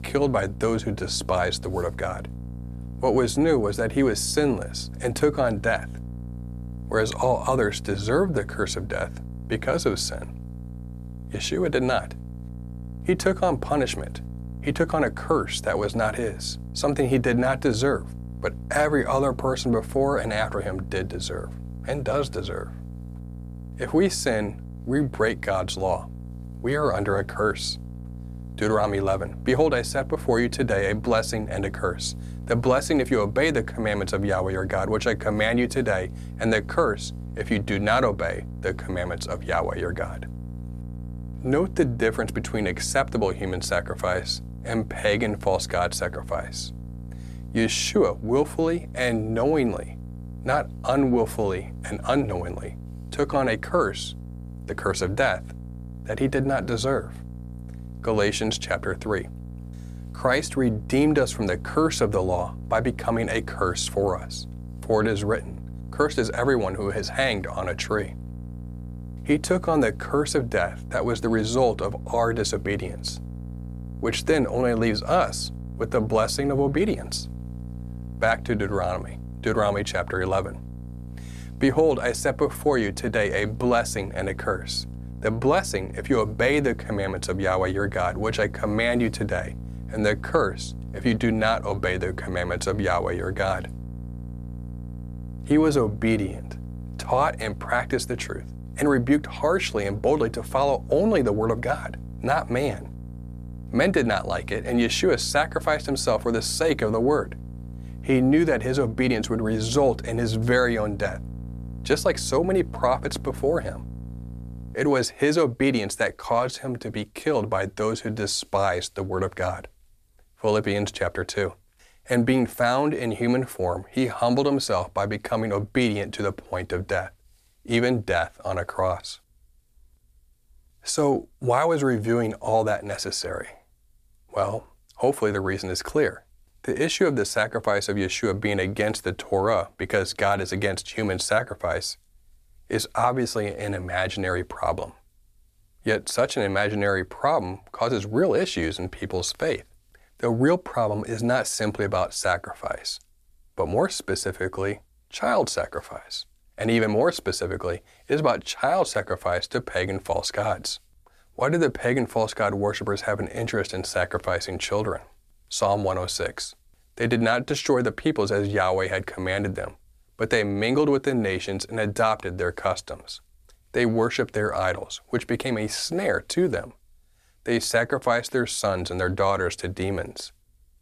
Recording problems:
electrical hum; faint; until 1:55; 60 Hz, 25 dB below the speech

